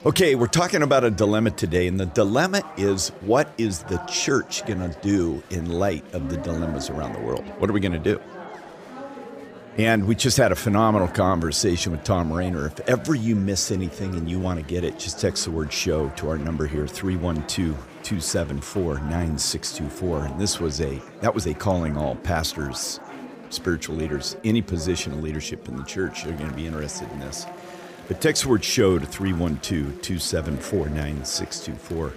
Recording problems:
chatter from many people; noticeable; throughout; 15 dB below the speech

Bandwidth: 15 kHz